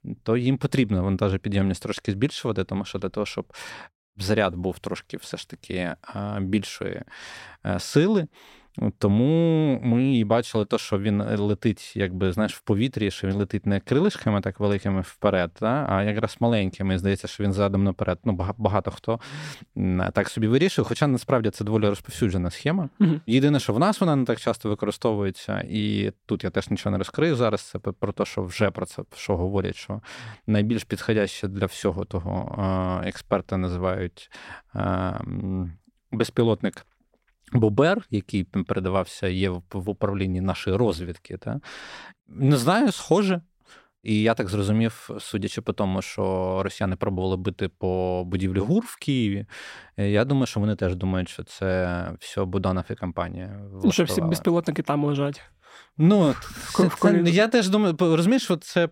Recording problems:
none

